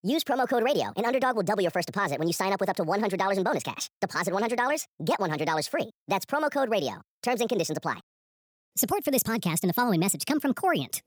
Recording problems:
wrong speed and pitch; too fast and too high; 1.5 times normal speed

